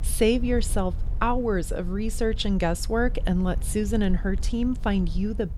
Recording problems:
low rumble; faint; throughout; 20 dB below the speech

